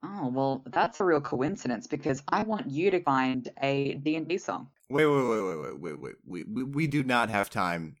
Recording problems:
choppy; very; 11% of the speech affected

